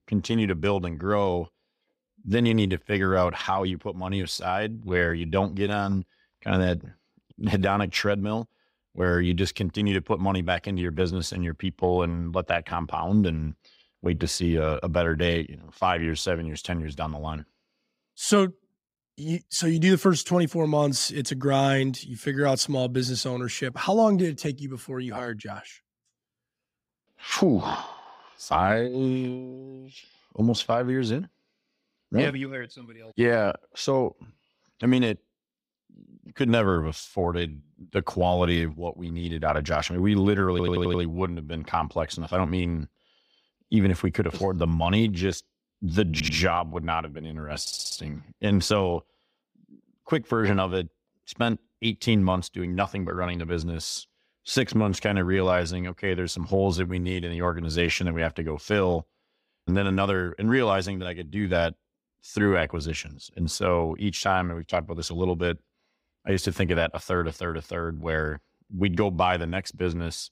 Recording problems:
audio stuttering; at 41 s, at 46 s and at 48 s

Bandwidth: 15.5 kHz